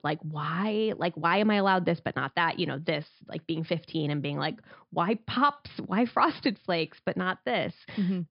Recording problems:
high frequencies cut off; noticeable; nothing above 5.5 kHz

